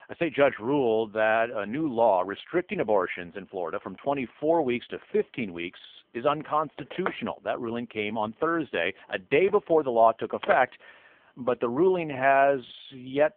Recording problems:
phone-call audio; poor line
phone ringing; noticeable; from 5 to 11 s; peak 9 dB below the speech

